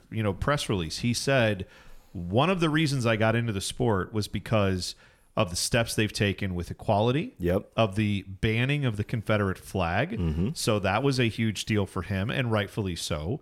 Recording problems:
none

